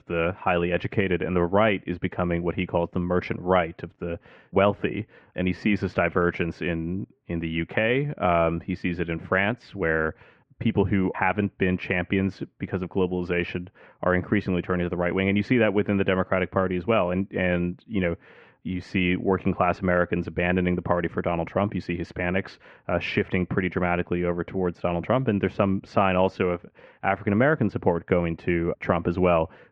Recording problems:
muffled; very; fading above 2 kHz

